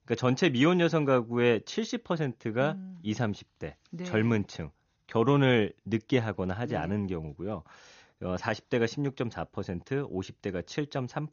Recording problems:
garbled, watery; slightly; nothing above 6.5 kHz

